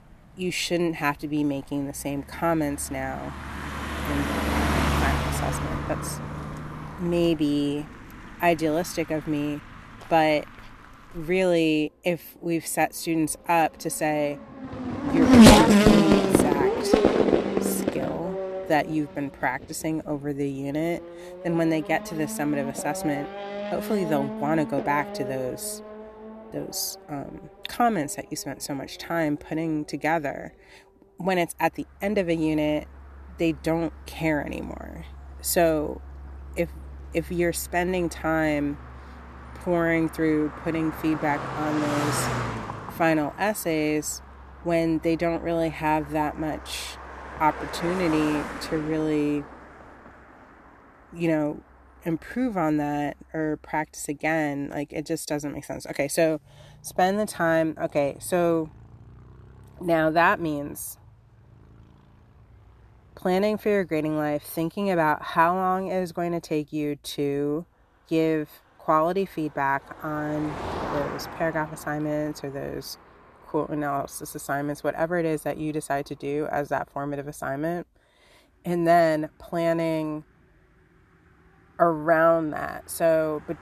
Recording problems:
traffic noise; very loud; throughout; 1 dB above the speech

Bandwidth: 13.5 kHz